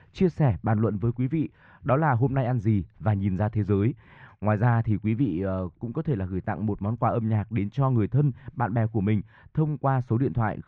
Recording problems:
muffled; very; fading above 1.5 kHz

